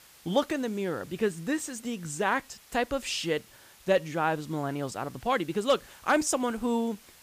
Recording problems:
hiss; faint; throughout; 25 dB below the speech

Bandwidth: 15 kHz